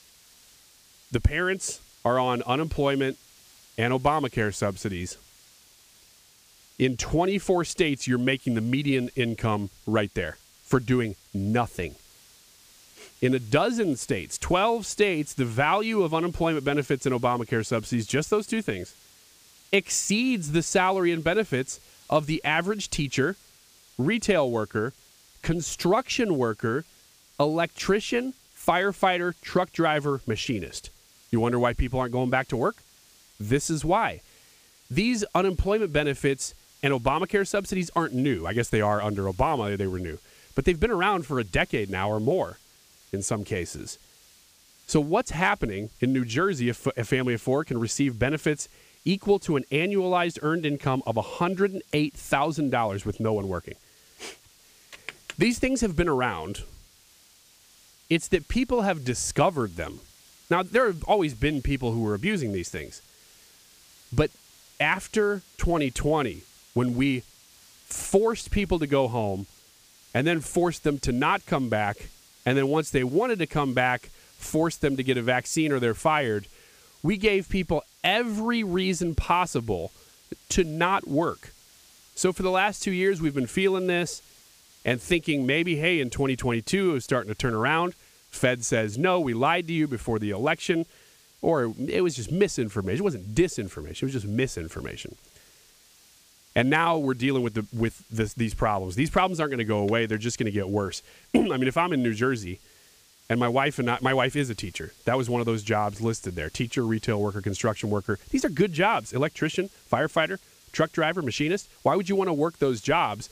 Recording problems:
hiss; faint; throughout; 25 dB below the speech

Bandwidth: 15 kHz